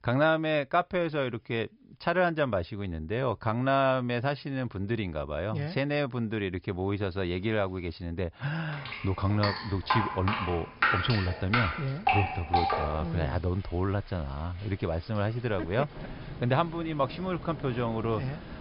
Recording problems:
high frequencies cut off; noticeable; nothing above 5.5 kHz
rain or running water; loud; from 9 s on; 2 dB below the speech

